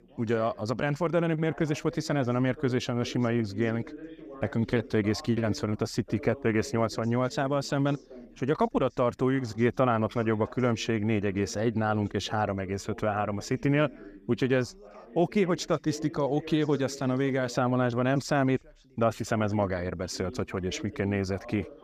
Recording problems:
background chatter; noticeable; throughout; 2 voices, 20 dB below the speech

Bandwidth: 15 kHz